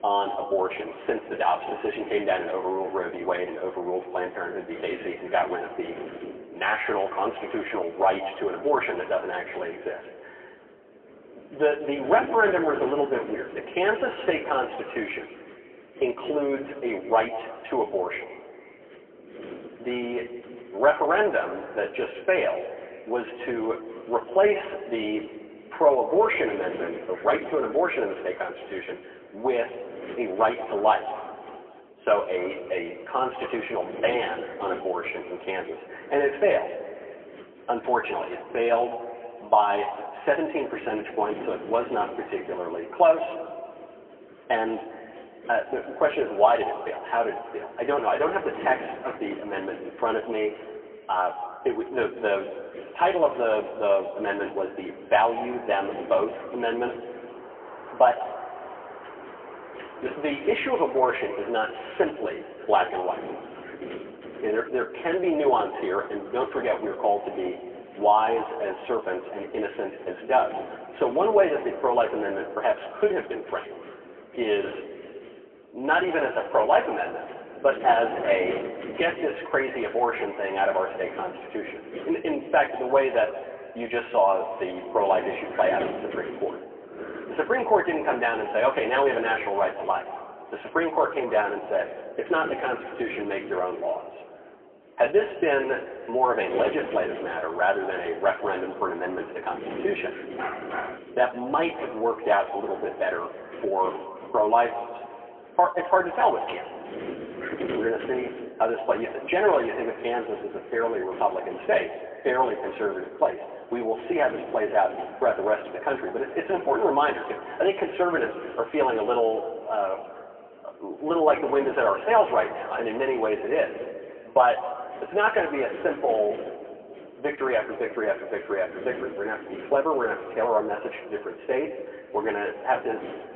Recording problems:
phone-call audio; poor line; nothing above 3 kHz
room echo; slight; dies away in 1.9 s
off-mic speech; somewhat distant
wind noise on the microphone; occasional gusts; 20 dB below the speech
door banging; faint; from 57 s to 1:04; peak 10 dB below the speech
dog barking; noticeable; at 1:40; peak 6 dB below the speech

